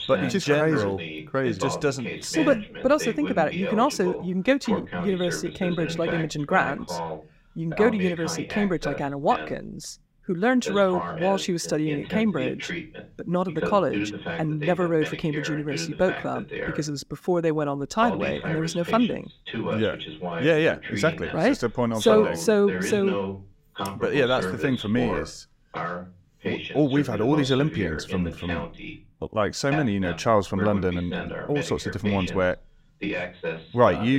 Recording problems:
voice in the background; loud; throughout; 8 dB below the speech
abrupt cut into speech; at the end

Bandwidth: 16 kHz